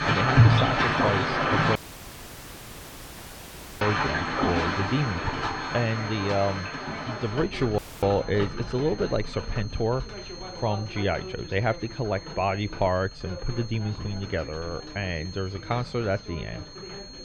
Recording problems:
muffled; very slightly; fading above 4 kHz
rain or running water; very loud; throughout; 3 dB above the speech
high-pitched whine; noticeable; throughout; 4.5 kHz, 15 dB below the speech
voice in the background; noticeable; throughout; 15 dB below the speech
audio cutting out; at 2 s for 2 s and at 8 s

